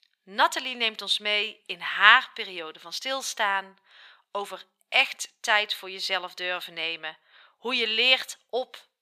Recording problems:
thin; very; fading below 700 Hz

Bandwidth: 14.5 kHz